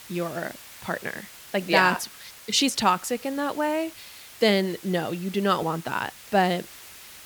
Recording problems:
hiss; noticeable; throughout; 20 dB below the speech

